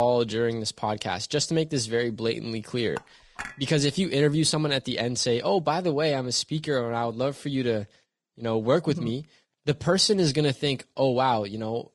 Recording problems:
garbled, watery; slightly; nothing above 10 kHz
abrupt cut into speech; at the start
clattering dishes; faint; at 3 s; peak 15 dB below the speech

